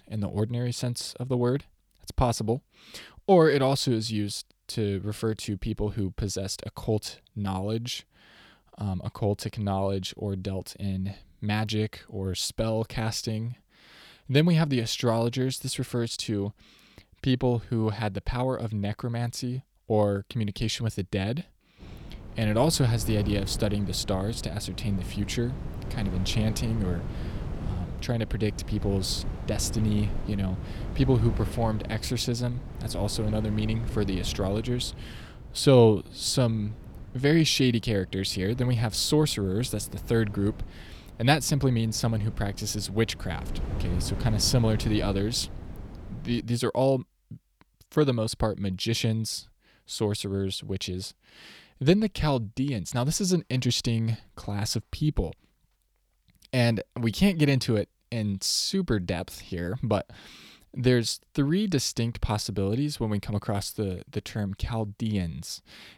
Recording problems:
wind noise on the microphone; occasional gusts; from 22 to 46 s; 15 dB below the speech

